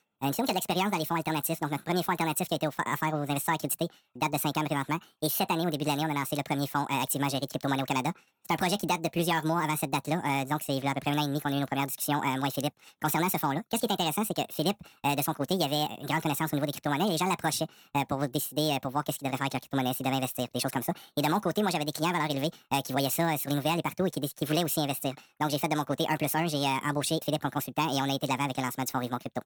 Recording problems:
wrong speed and pitch; too fast and too high; 1.6 times normal speed

